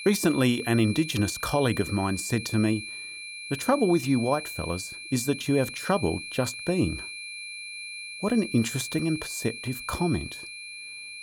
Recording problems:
high-pitched whine; loud; throughout; 2.5 kHz, 9 dB below the speech

